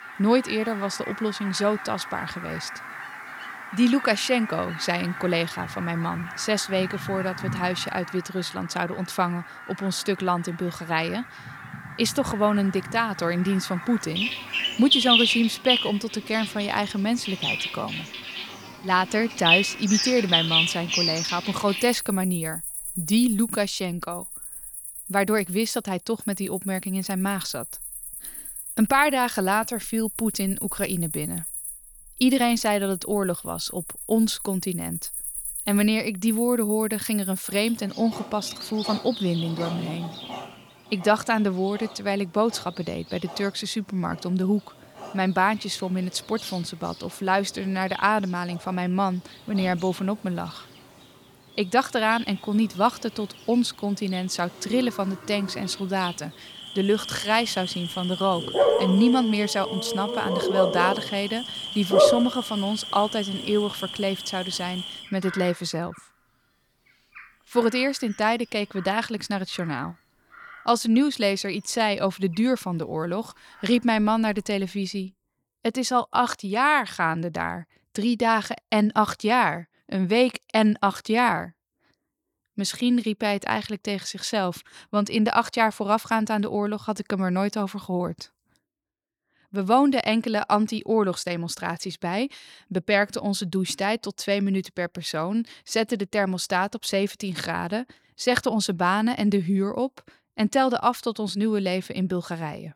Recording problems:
animal sounds; loud; until 1:15; 4 dB below the speech

